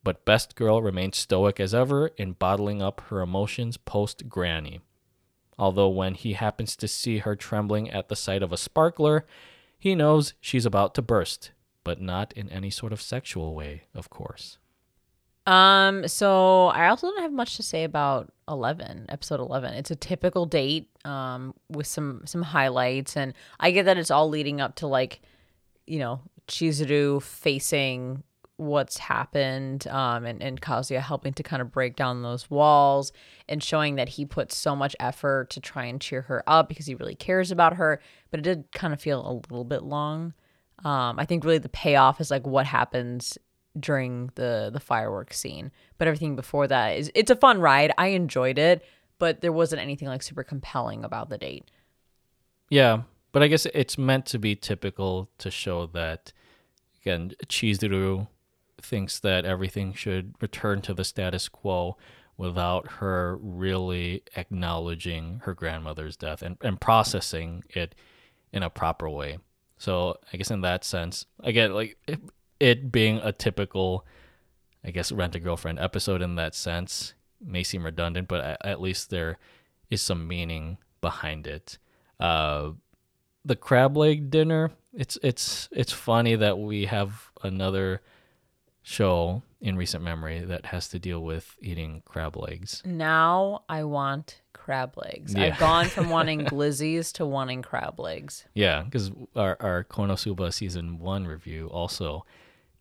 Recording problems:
none

